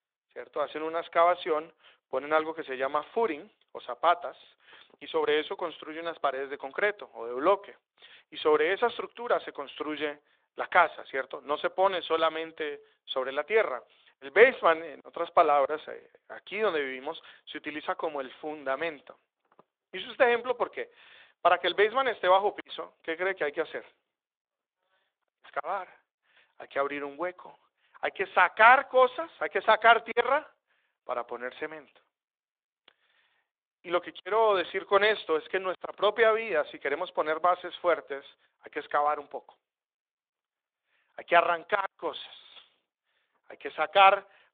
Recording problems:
phone-call audio; nothing above 3.5 kHz

